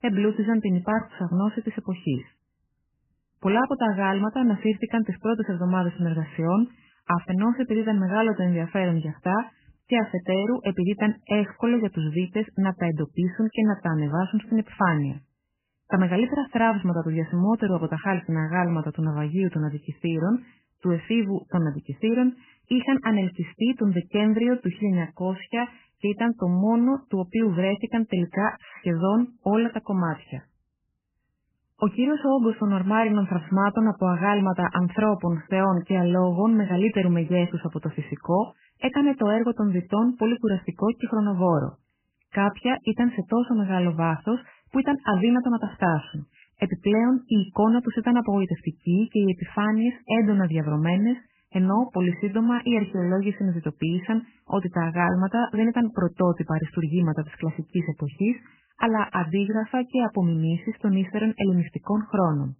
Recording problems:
garbled, watery; badly; nothing above 3 kHz

